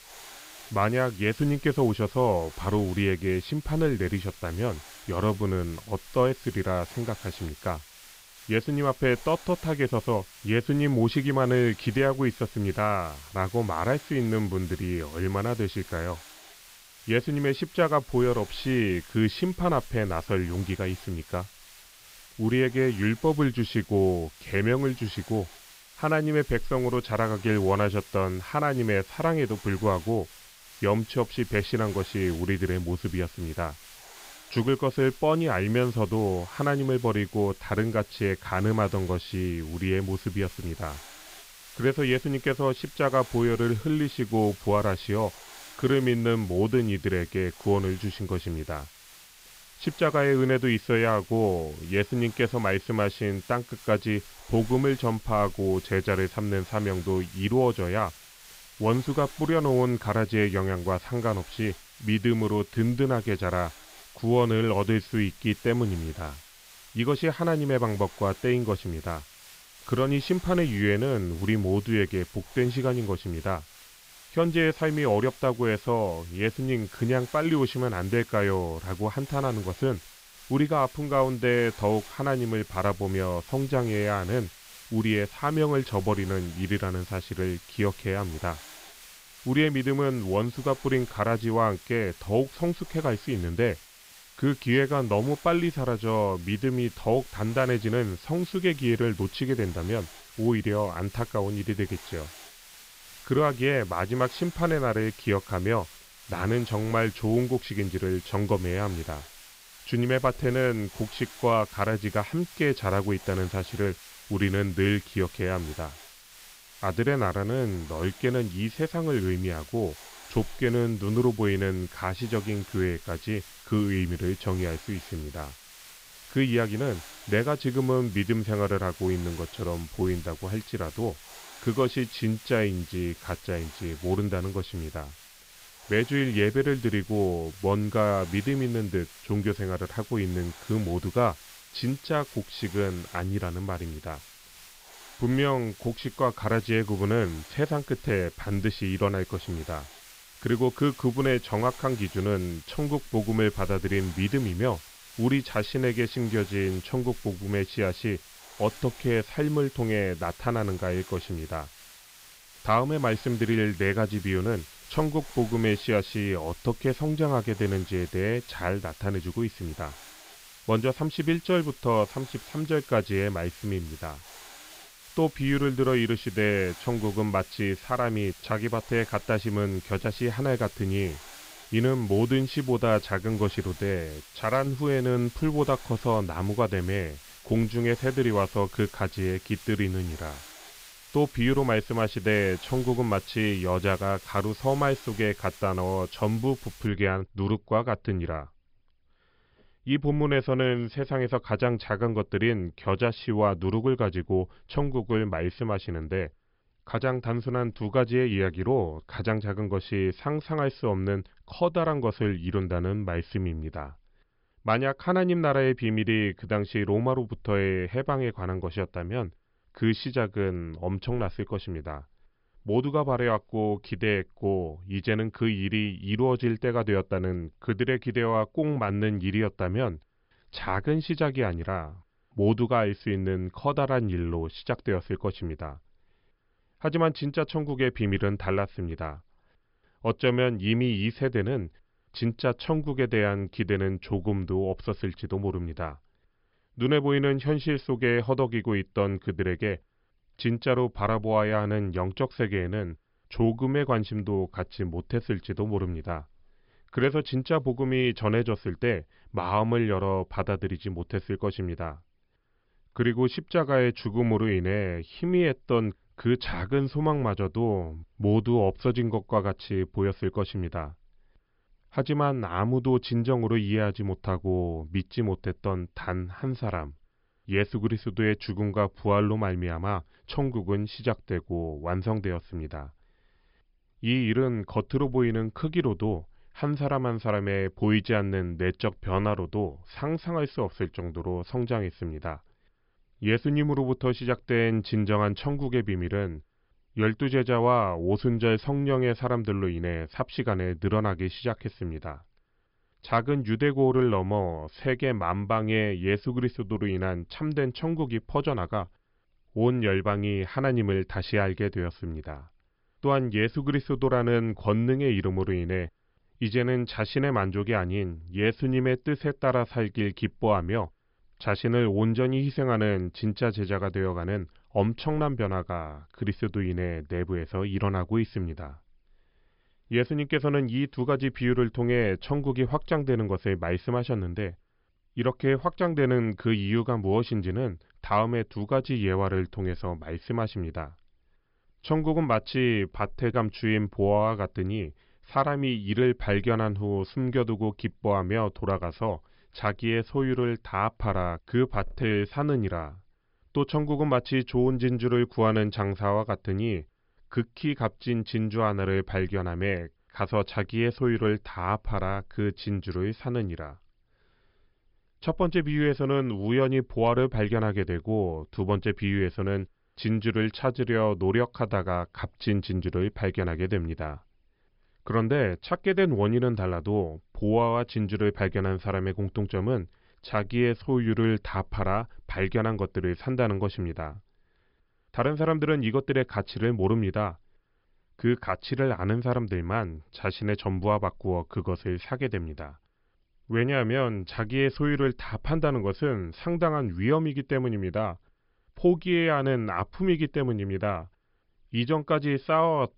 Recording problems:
high frequencies cut off; noticeable; nothing above 5.5 kHz
hiss; noticeable; until 3:17; 20 dB below the speech

